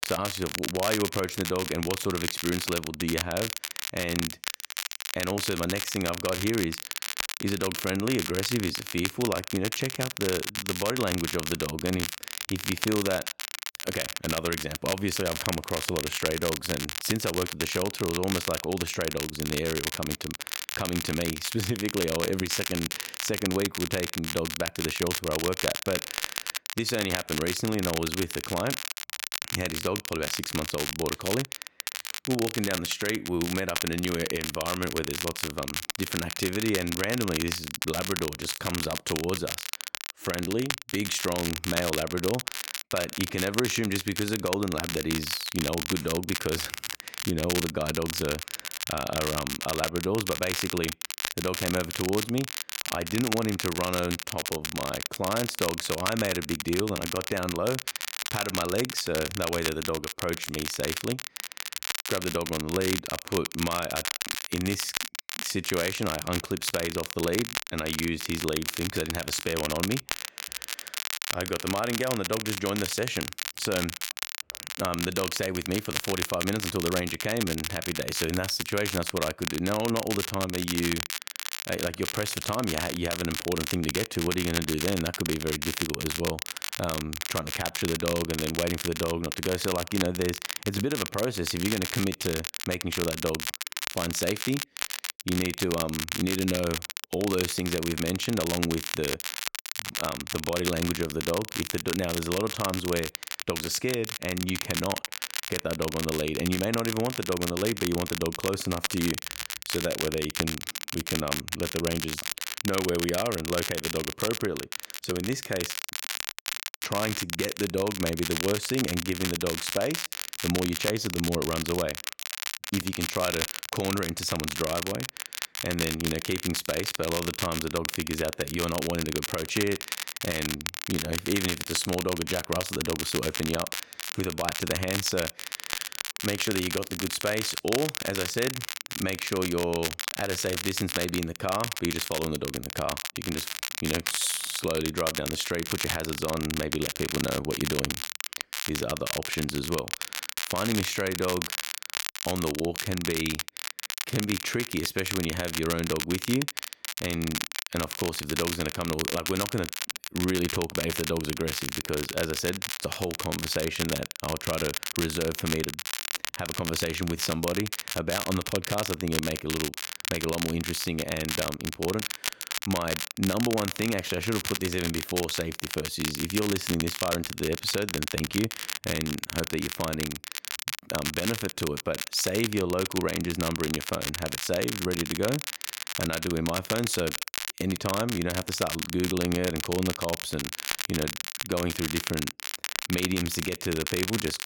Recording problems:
crackle, like an old record; loud; 2 dB below the speech

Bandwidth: 17 kHz